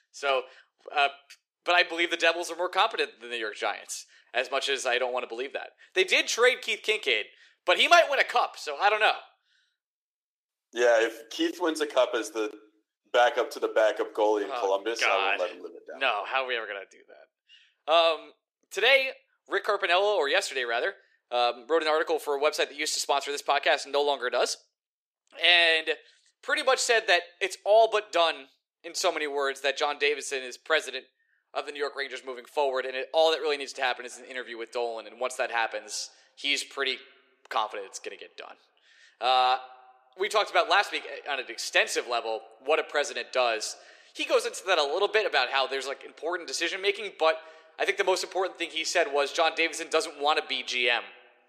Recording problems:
thin; somewhat; fading below 400 Hz
echo of what is said; faint; from 34 s on; 100 ms later, 25 dB below the speech

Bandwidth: 14.5 kHz